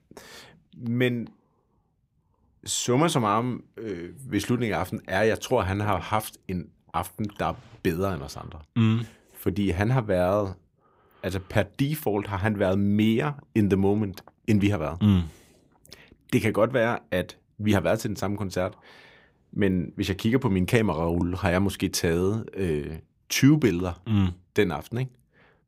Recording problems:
none

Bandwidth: 15.5 kHz